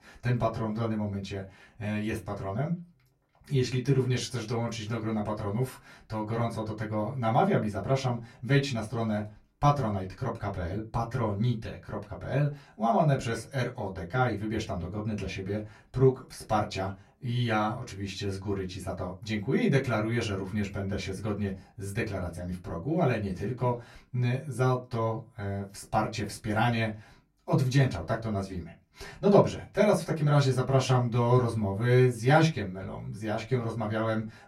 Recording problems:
off-mic speech; far
room echo; very slight; dies away in 0.2 s

